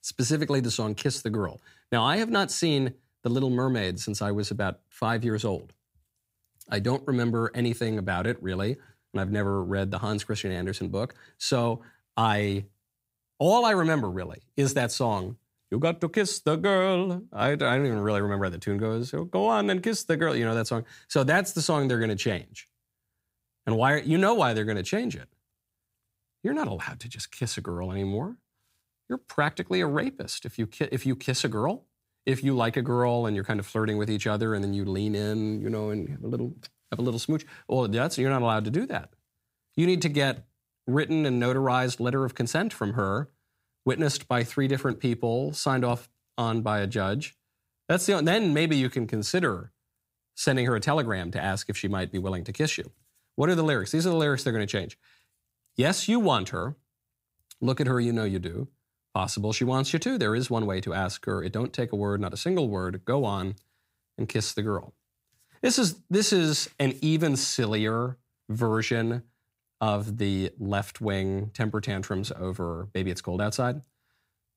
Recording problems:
none

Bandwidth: 15.5 kHz